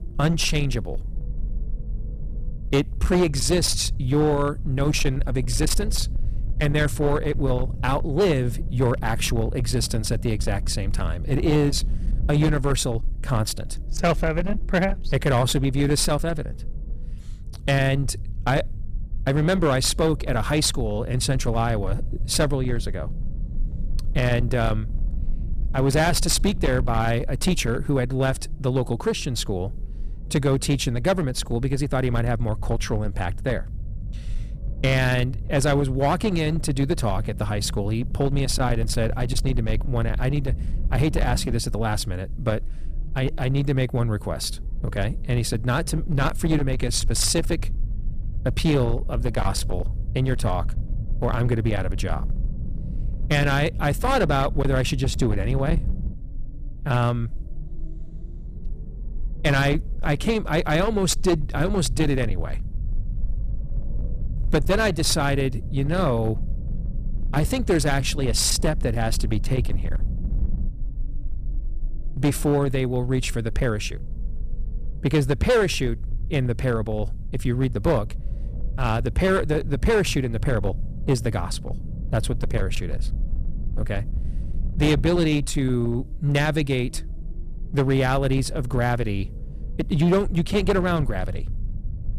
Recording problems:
distortion; slight; 11% of the sound clipped
low rumble; noticeable; throughout; 20 dB below the speech

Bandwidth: 14.5 kHz